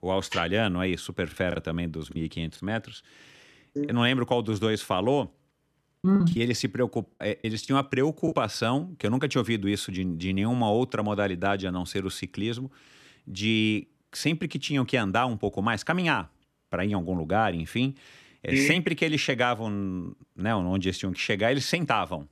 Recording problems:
choppy; very; from 1.5 to 2.5 s and from 6 to 8.5 s; 12% of the speech affected

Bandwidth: 13.5 kHz